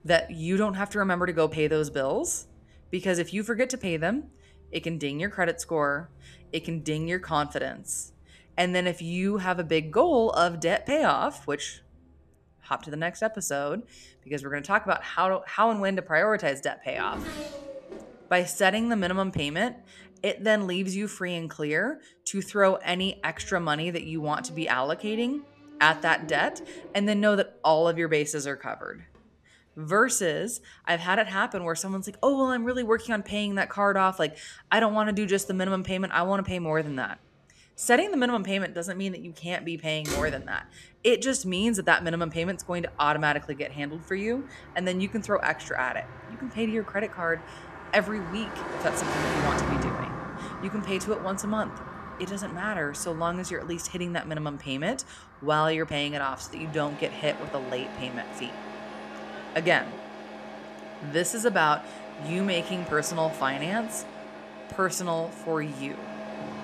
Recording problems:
traffic noise; noticeable; throughout; 10 dB below the speech

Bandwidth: 13.5 kHz